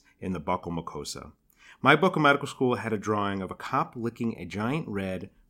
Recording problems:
none

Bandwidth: 16 kHz